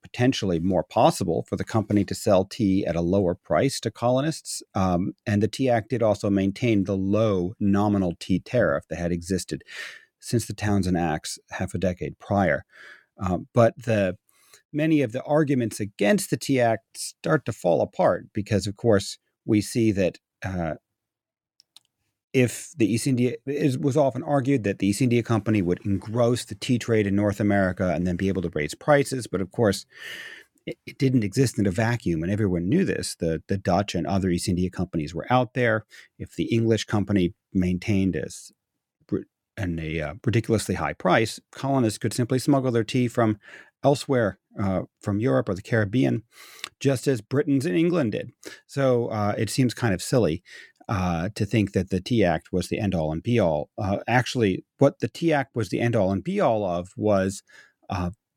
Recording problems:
none

